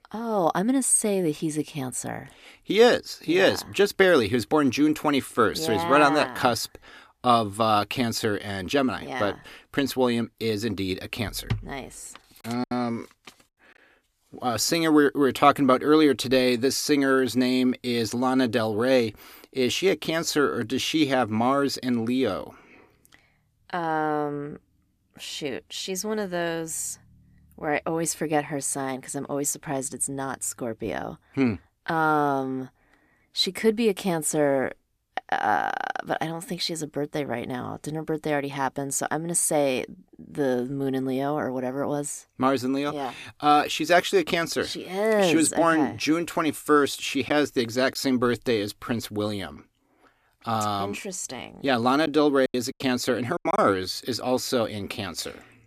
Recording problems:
choppy; occasionally; at 13 s and from 52 to 54 s; 5% of the speech affected

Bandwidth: 14.5 kHz